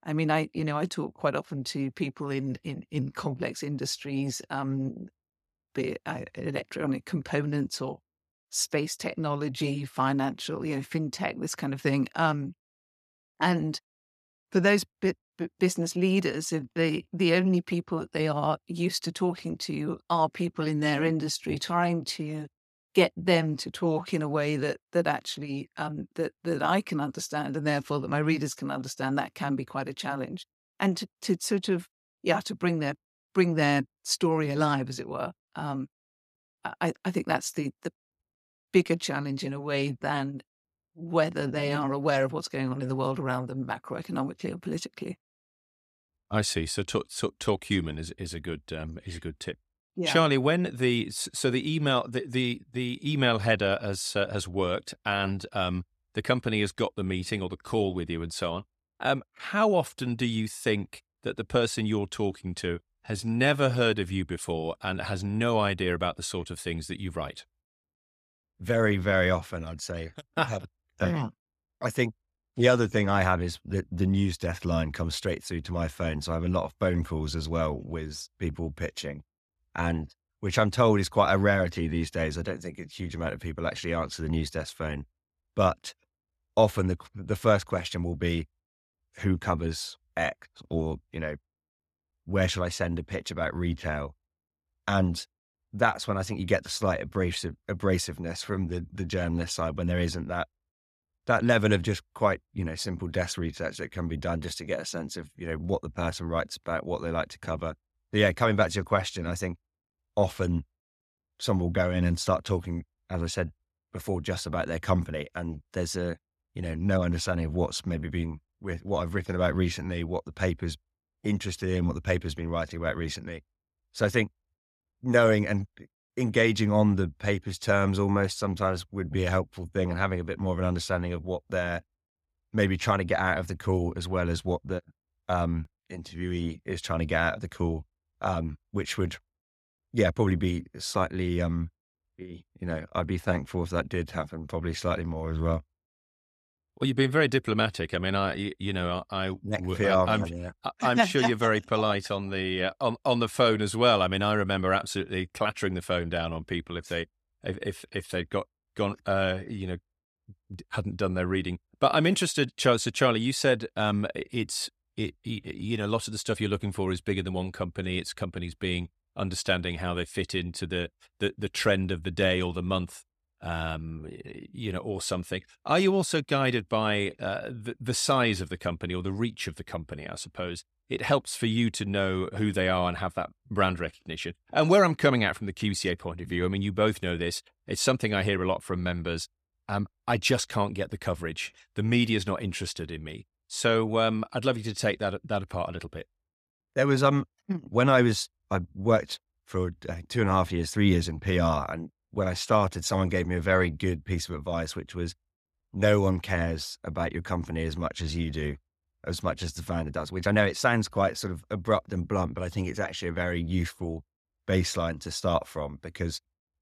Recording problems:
uneven, jittery; strongly; from 16 s to 3:31

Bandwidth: 14.5 kHz